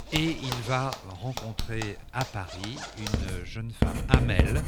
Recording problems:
household noises; very loud; throughout; 1 dB above the speech

